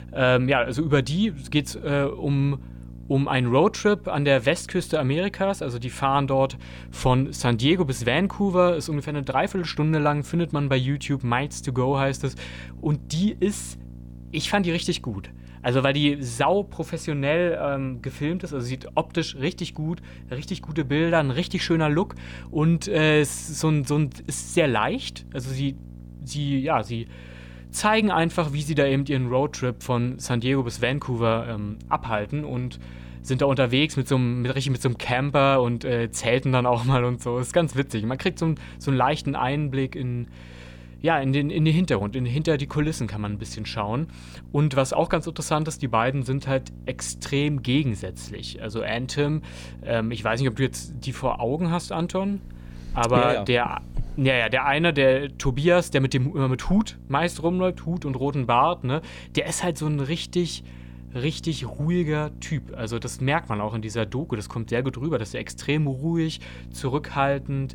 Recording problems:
electrical hum; faint; throughout; 60 Hz, 25 dB below the speech

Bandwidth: 19 kHz